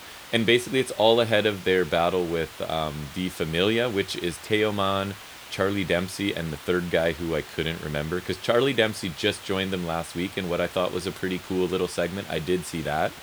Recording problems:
hiss; noticeable; throughout; 15 dB below the speech

